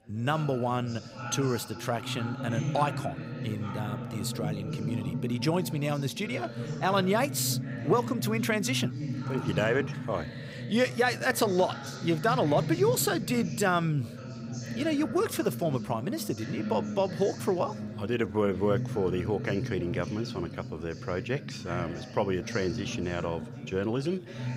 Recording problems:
background chatter; loud; throughout; 4 voices, 6 dB below the speech

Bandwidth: 15.5 kHz